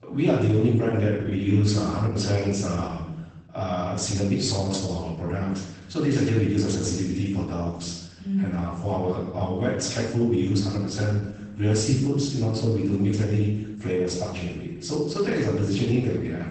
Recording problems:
off-mic speech; far
garbled, watery; badly; nothing above 8 kHz
room echo; noticeable; dies away in 0.9 s

